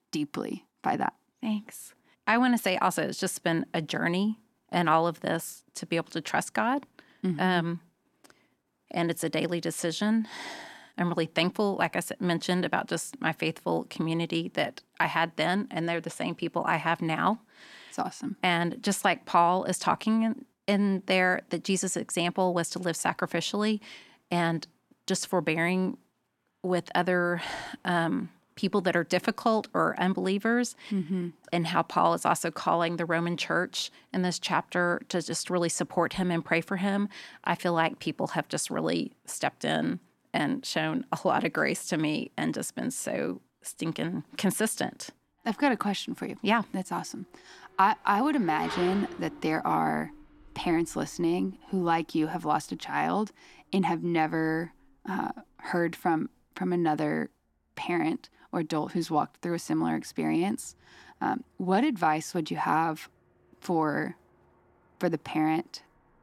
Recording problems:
traffic noise; noticeable; throughout; 20 dB below the speech

